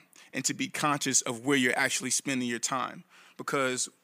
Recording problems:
none

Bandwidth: 15 kHz